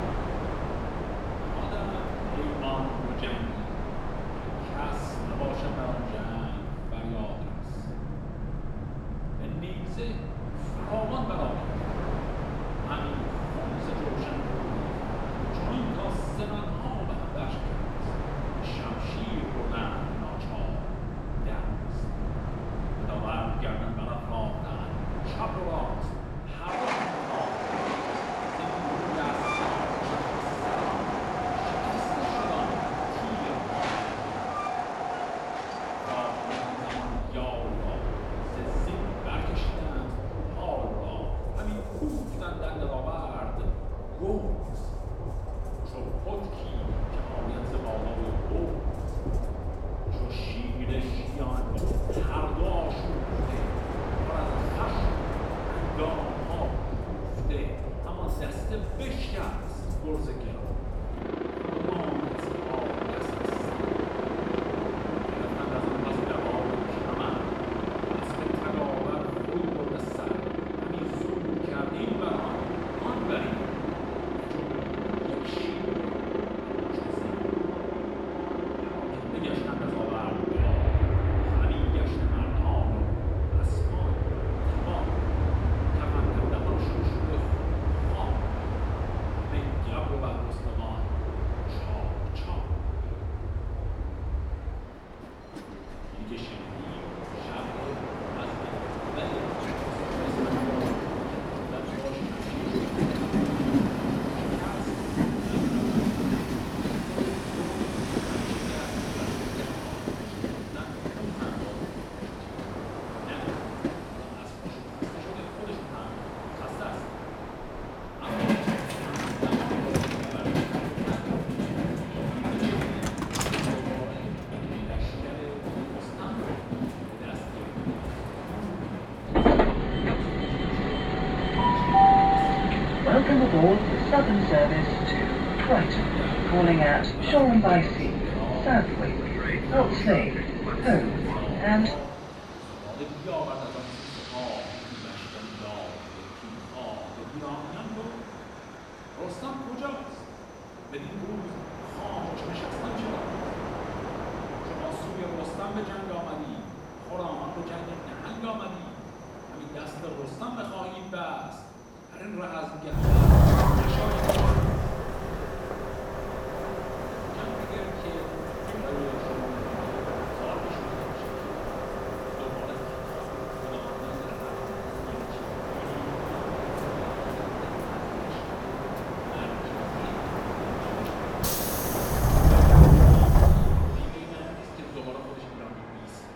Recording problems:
off-mic speech; far
room echo; noticeable; dies away in 1 s
train or aircraft noise; very loud; throughout; 9 dB above the speech

